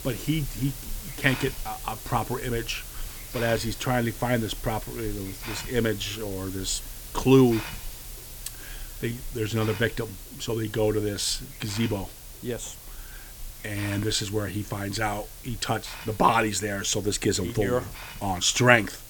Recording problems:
hiss; noticeable; throughout; 10 dB below the speech

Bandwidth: 18.5 kHz